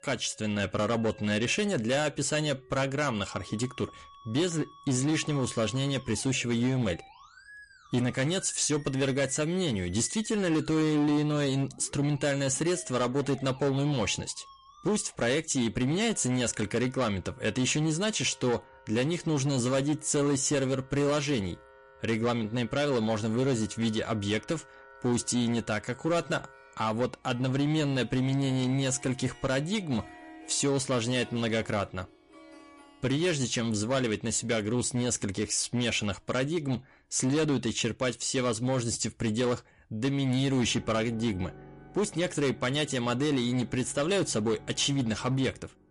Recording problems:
distortion; slight; 10% of the sound clipped
garbled, watery; slightly; nothing above 10.5 kHz
background music; faint; throughout; 25 dB below the speech

